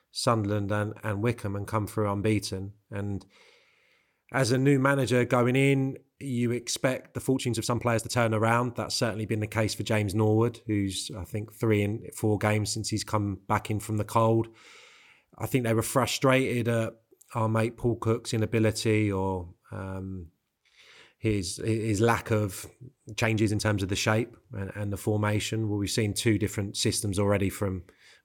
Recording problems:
uneven, jittery; strongly; from 4.5 to 24 s

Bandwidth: 17 kHz